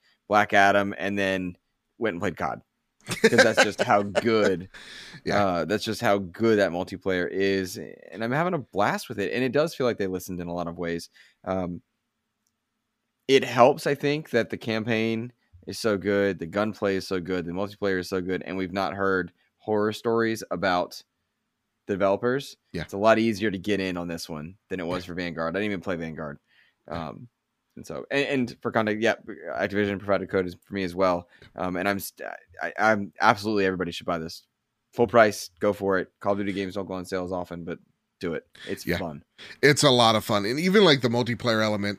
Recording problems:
none

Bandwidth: 15 kHz